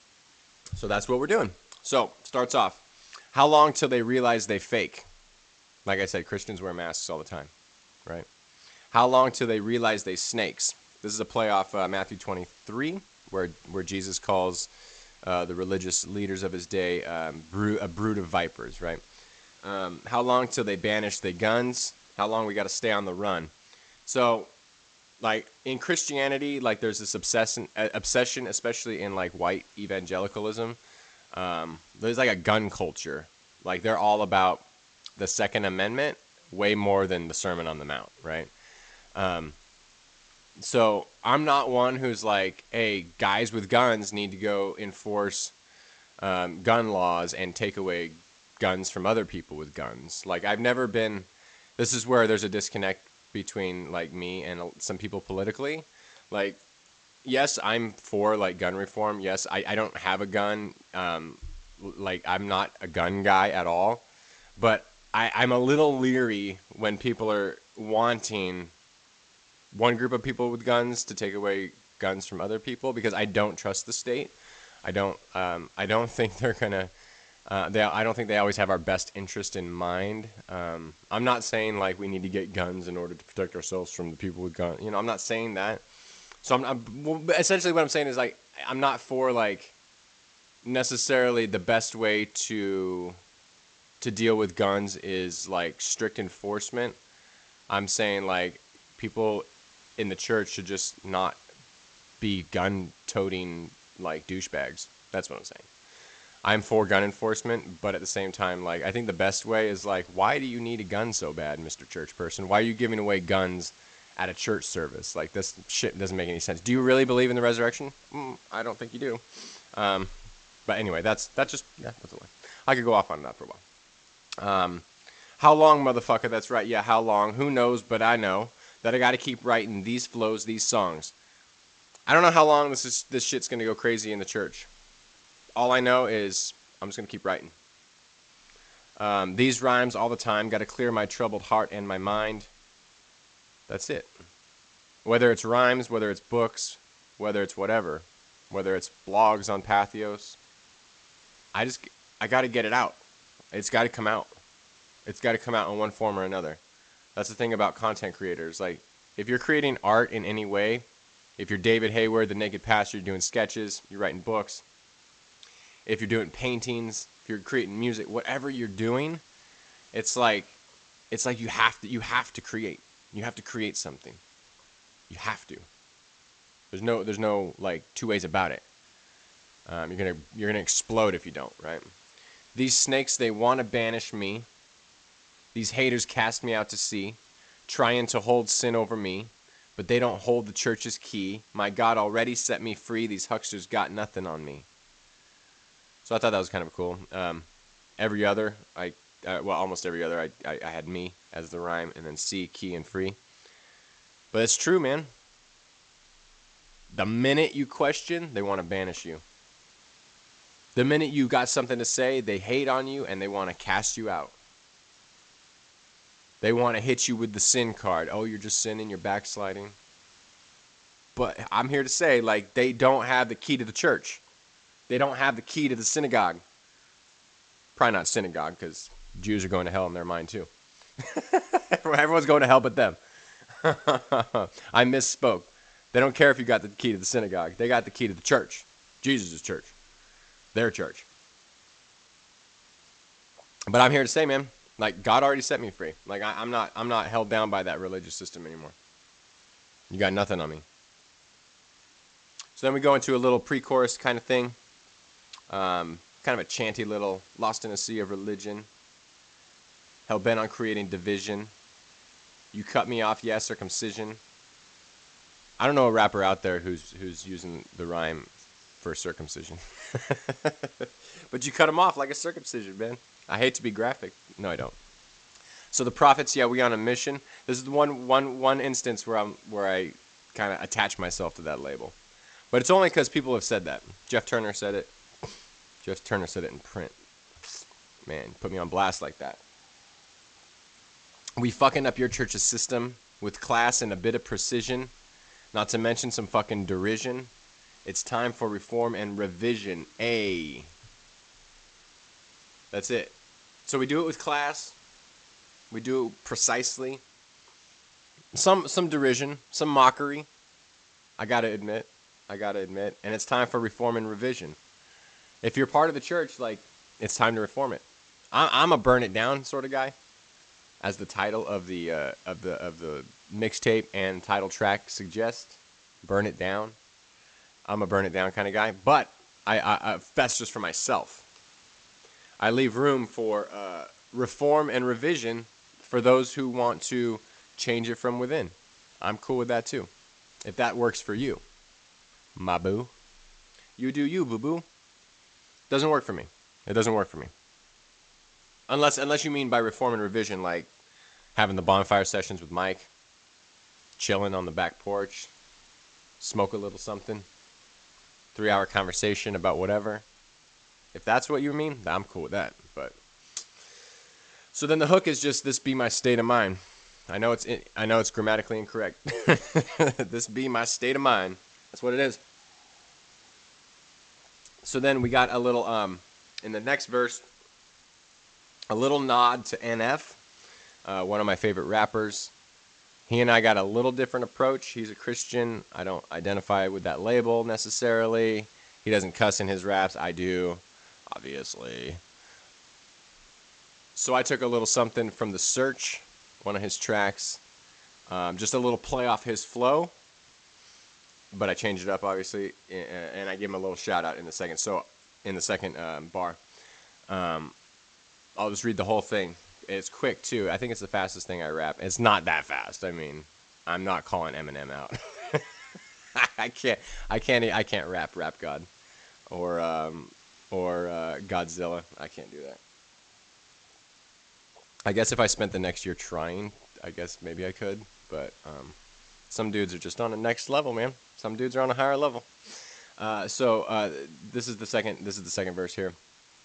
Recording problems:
garbled, watery; slightly; nothing above 8 kHz
hiss; faint; throughout; 30 dB below the speech

